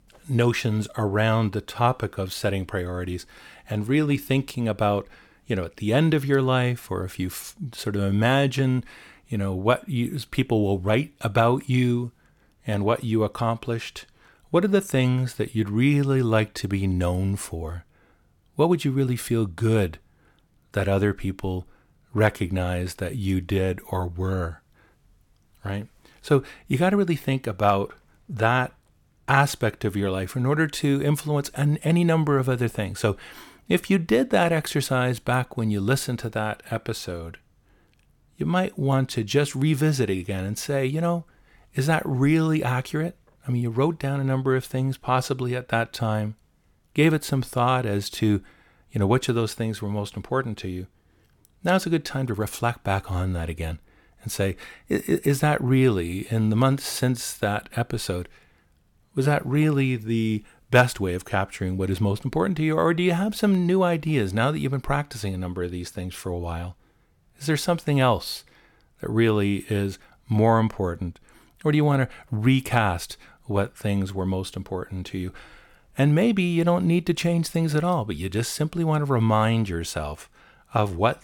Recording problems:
none

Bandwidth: 17.5 kHz